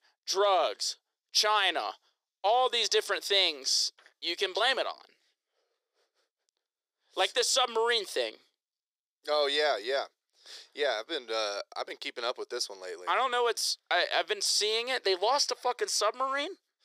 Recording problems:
thin; very; fading below 400 Hz

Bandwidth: 15.5 kHz